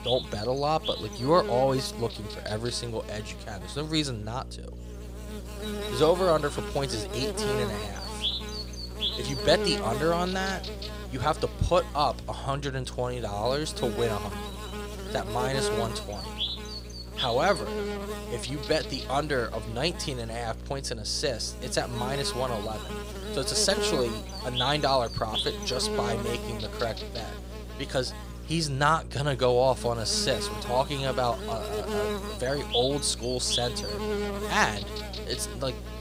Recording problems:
electrical hum; loud; throughout; 60 Hz, 6 dB below the speech

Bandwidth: 15.5 kHz